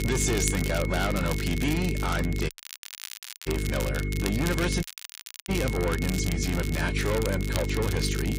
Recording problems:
distortion; heavy; 7 dB below the speech
garbled, watery; slightly; nothing above 11 kHz
electrical hum; loud; throughout; 50 Hz, 10 dB below the speech
high-pitched whine; loud; throughout; 2 kHz, 10 dB below the speech
crackle, like an old record; loud; 8 dB below the speech
audio cutting out; at 2.5 s for 1 s and at 5 s for 0.5 s

